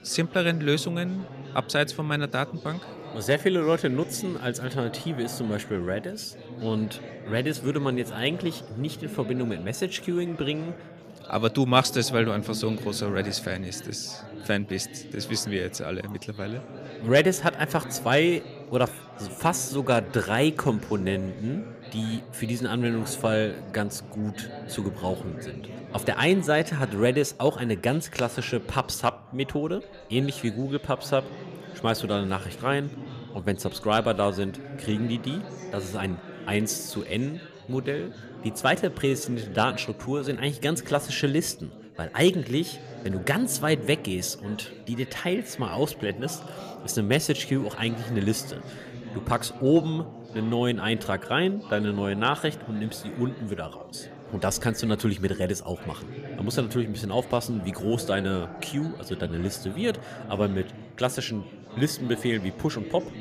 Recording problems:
chatter from many people; noticeable; throughout; 15 dB below the speech

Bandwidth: 14.5 kHz